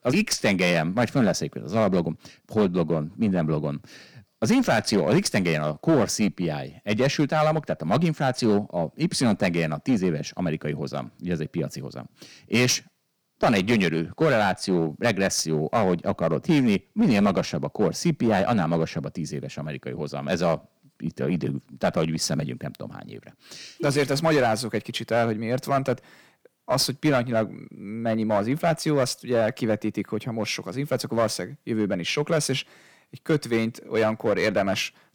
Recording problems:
distortion; slight; 5% of the sound clipped

